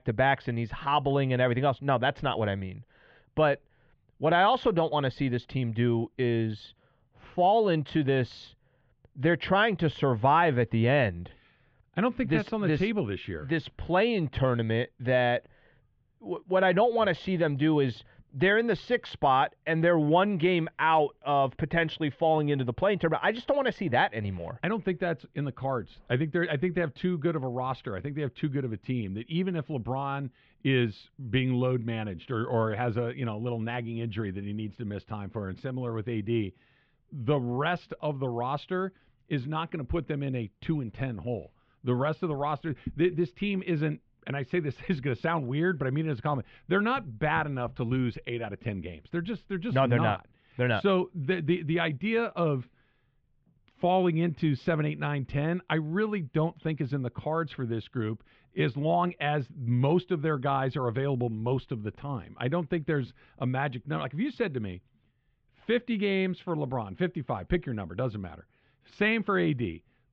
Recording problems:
muffled; very; fading above 3 kHz

